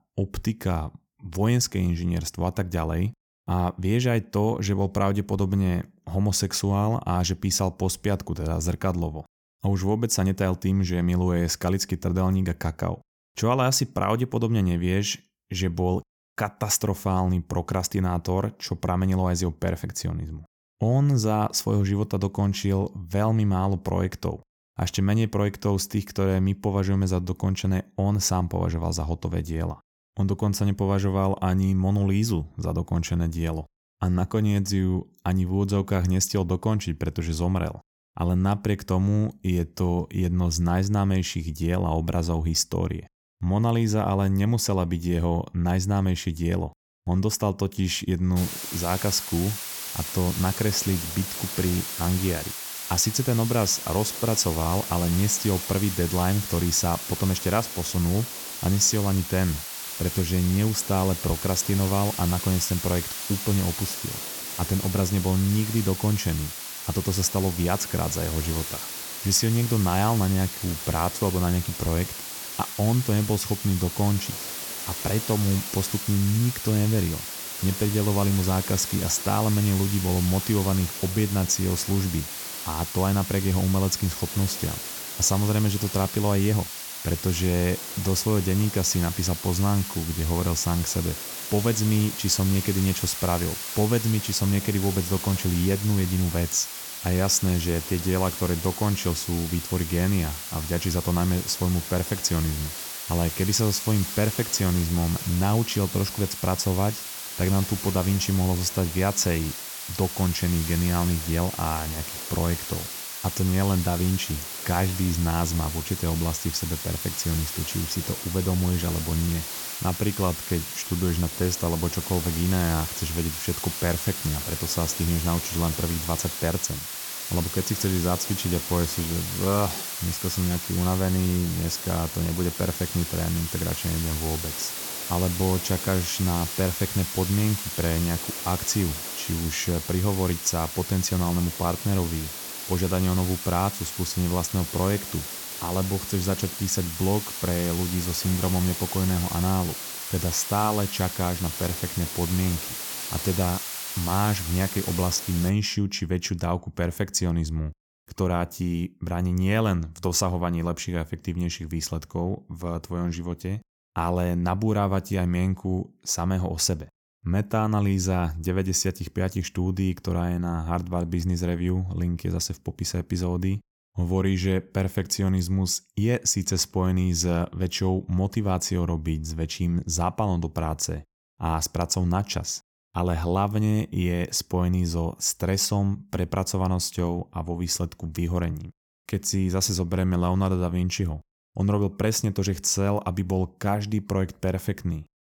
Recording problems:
hiss; loud; from 48 s to 2:35; 6 dB below the speech

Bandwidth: 17.5 kHz